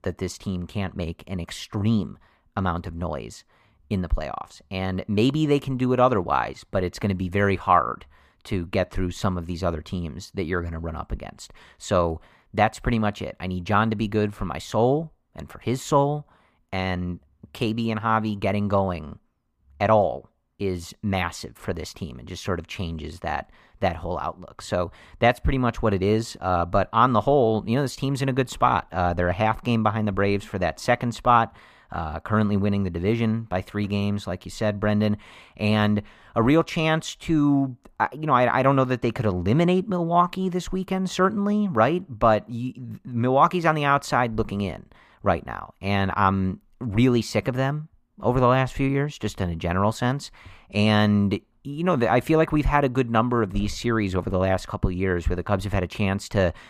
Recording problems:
muffled; slightly; fading above 3 kHz

